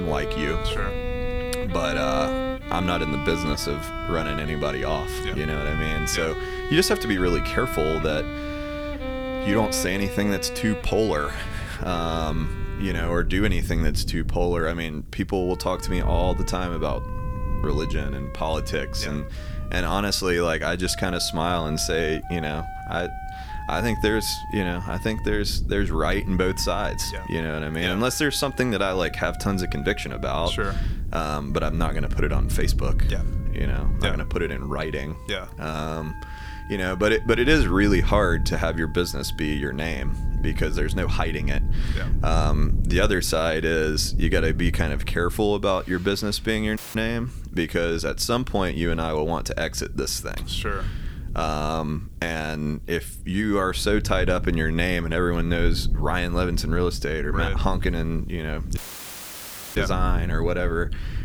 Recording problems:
background music; loud; throughout; 8 dB below the speech
low rumble; faint; throughout; 20 dB below the speech
abrupt cut into speech; at the start
audio cutting out; at 47 s and at 59 s for 1 s

